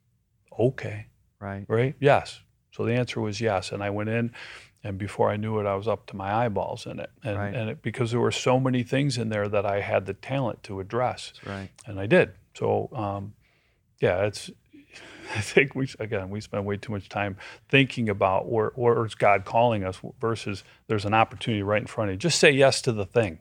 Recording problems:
none

